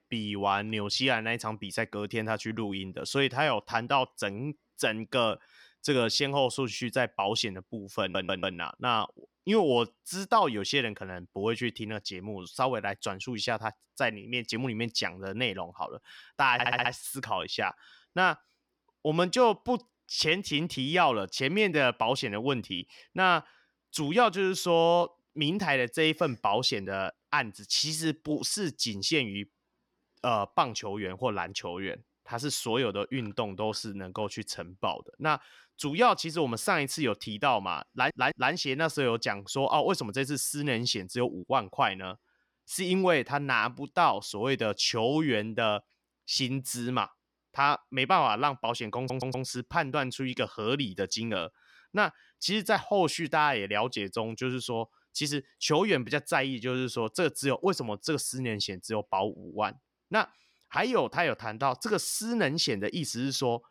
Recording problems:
audio stuttering; 4 times, first at 8 s

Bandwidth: 19 kHz